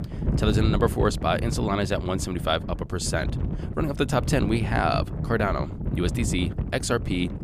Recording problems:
wind noise on the microphone; occasional gusts; 10 dB below the speech

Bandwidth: 15 kHz